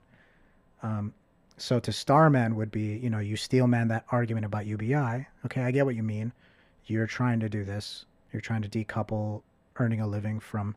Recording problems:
muffled; slightly; fading above 3.5 kHz

